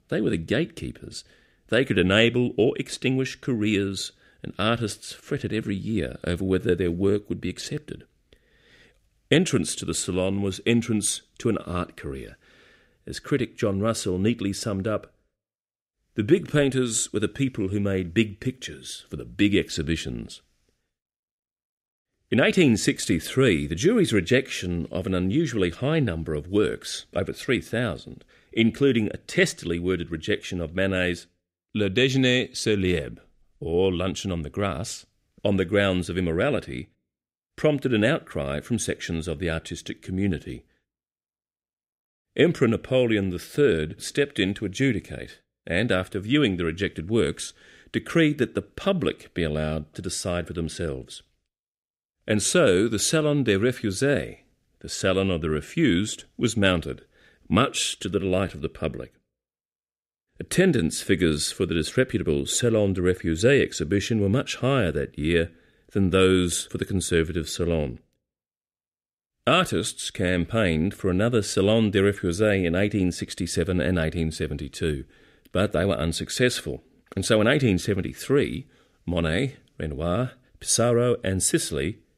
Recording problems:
none

